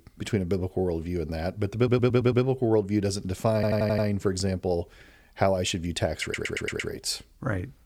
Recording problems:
audio stuttering; at 2 s, at 3.5 s and at 6 s

